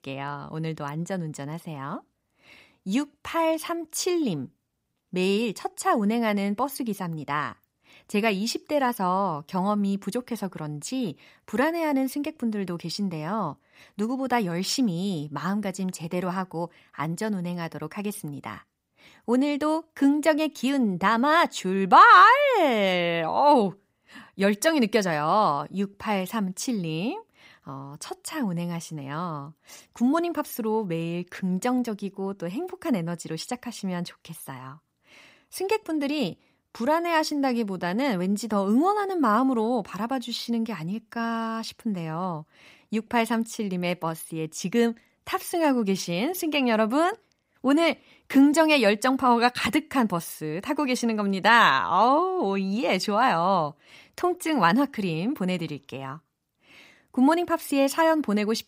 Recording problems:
none

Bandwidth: 15.5 kHz